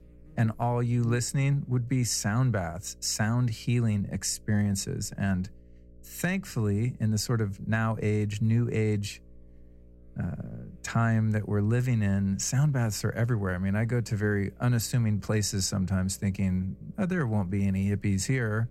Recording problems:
electrical hum; faint; throughout; 60 Hz, 30 dB below the speech

